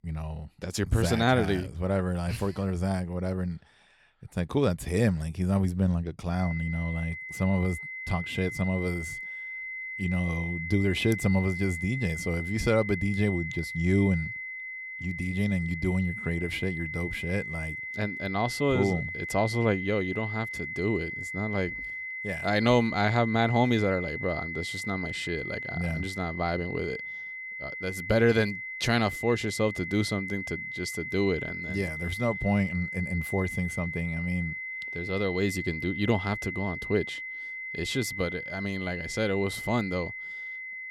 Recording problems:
high-pitched whine; loud; from 6.5 s on; 2 kHz, 6 dB below the speech

